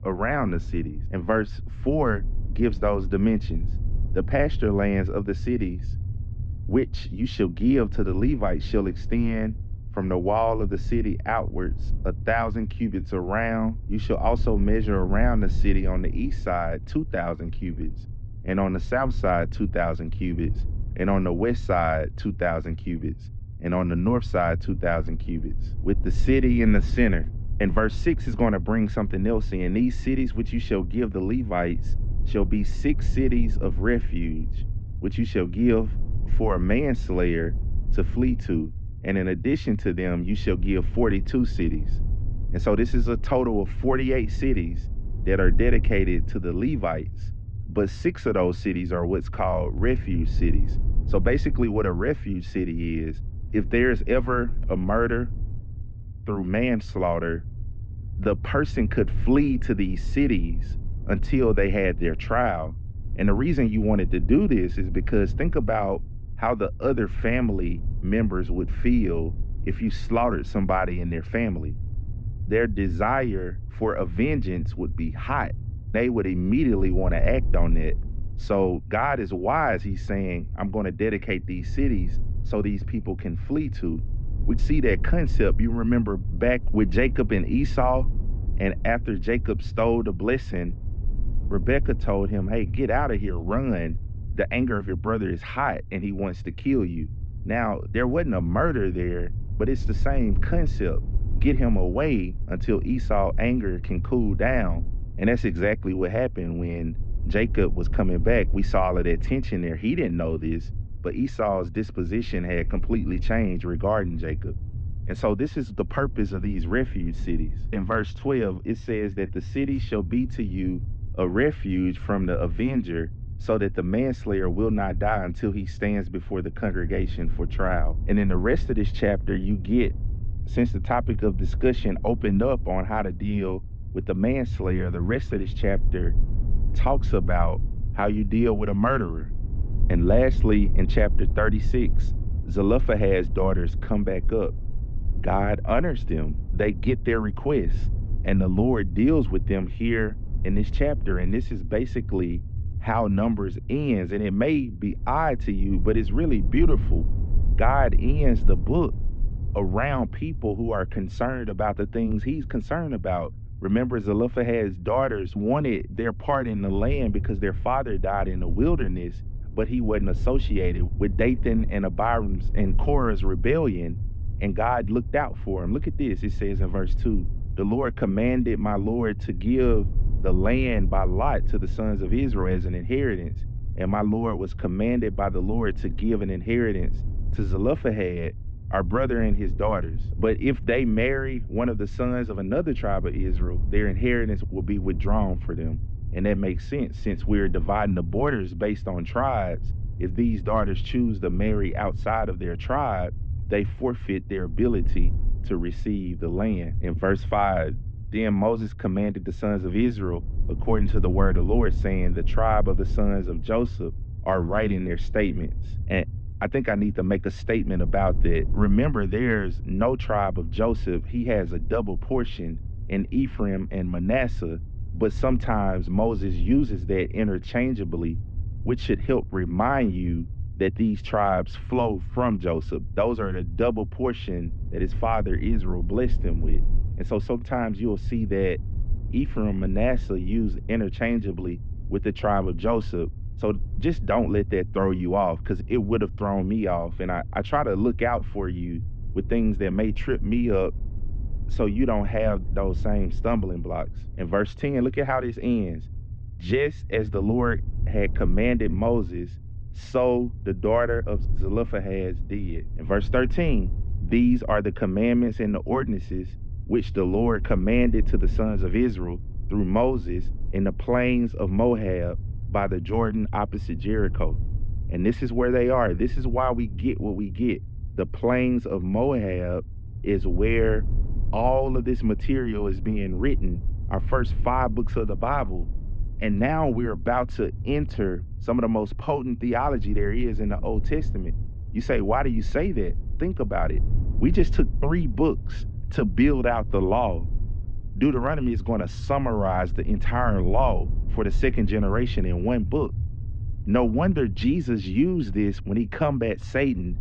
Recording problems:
muffled; very; fading above 3 kHz
low rumble; faint; throughout; 20 dB below the speech

